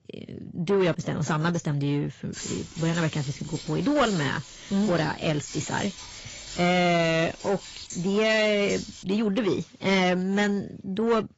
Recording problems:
garbled, watery; badly; nothing above 7.5 kHz
distortion; slight; 10 dB below the speech
jangling keys; noticeable; from 2.5 to 9 s; peak 10 dB below the speech

